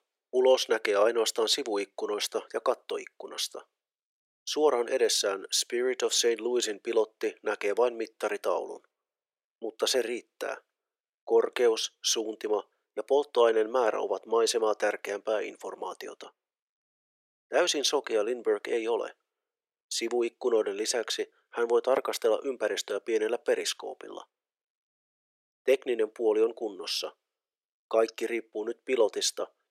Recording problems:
thin; very; fading below 400 Hz

